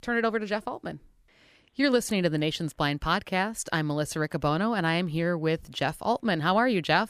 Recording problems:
none

